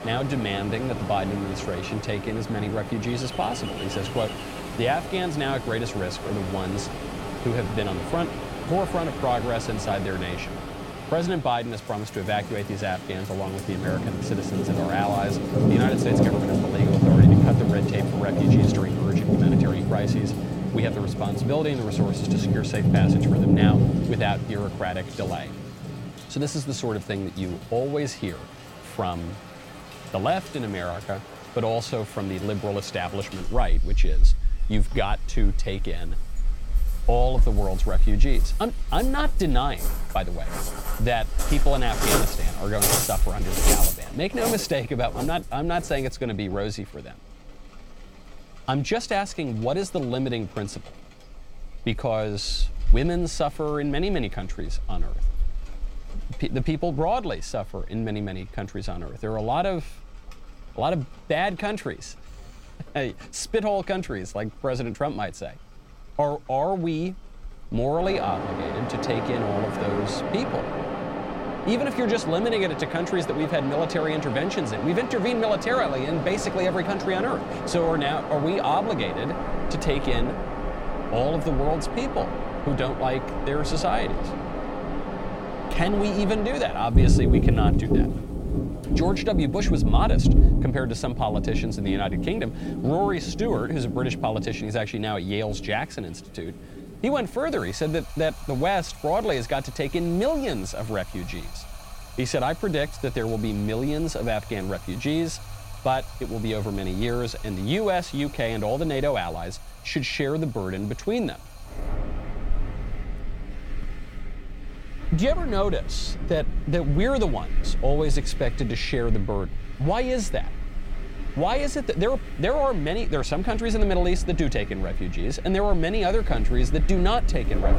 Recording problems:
rain or running water; very loud; throughout; as loud as the speech
wind in the background; faint; throughout; 30 dB below the speech

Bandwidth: 16.5 kHz